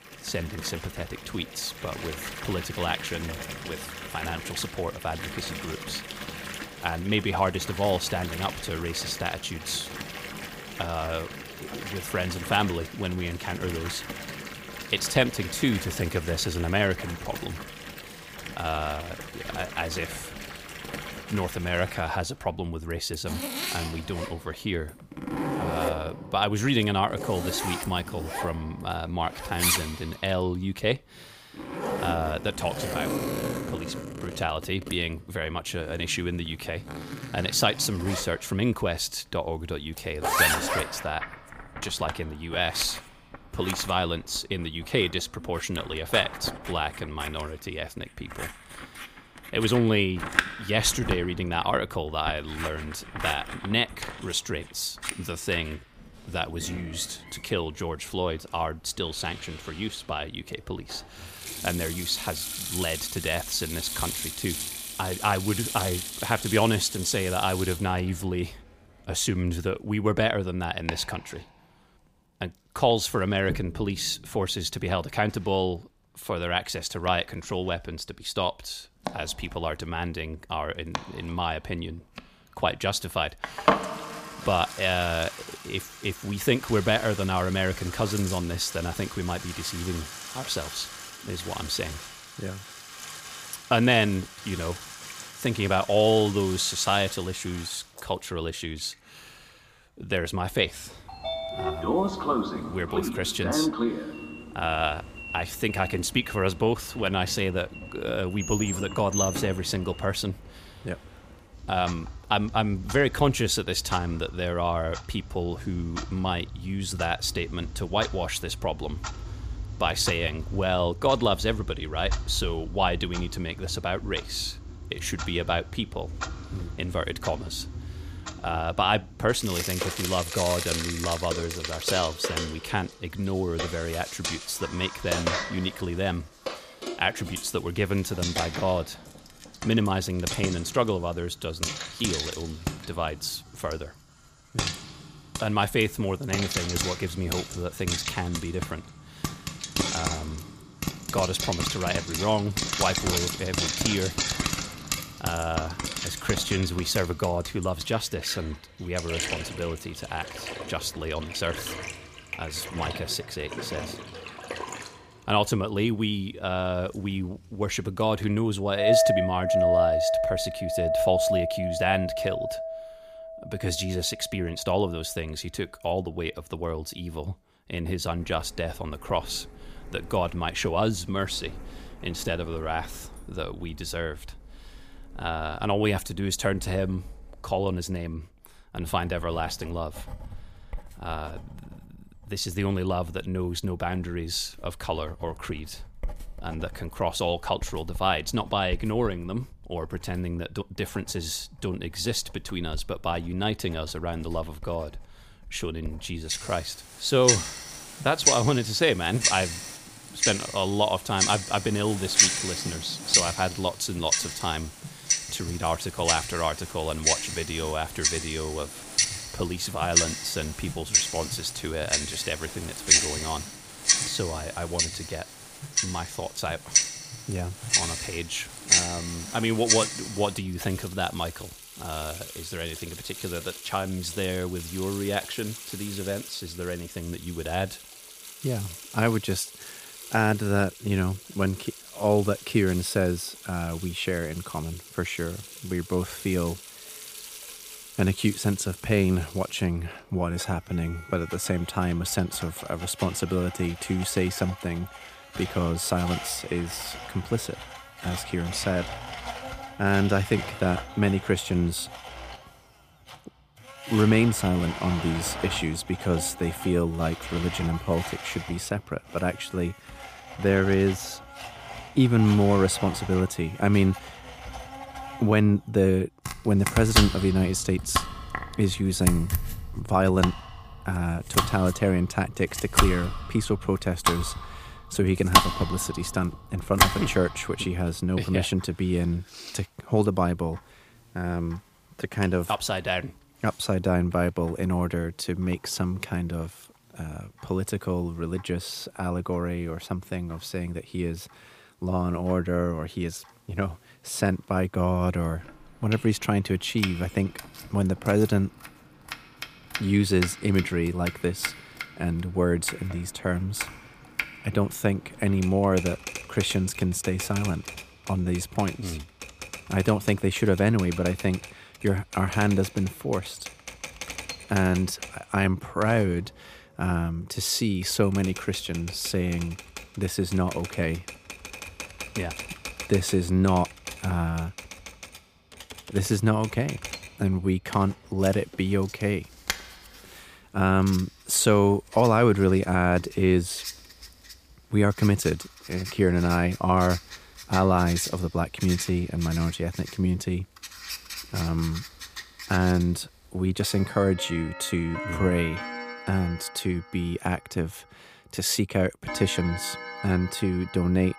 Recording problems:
household noises; loud; throughout; 4 dB below the speech

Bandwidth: 15 kHz